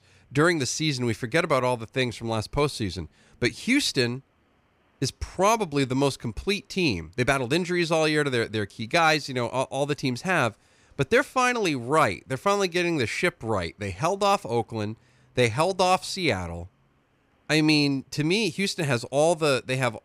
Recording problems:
none

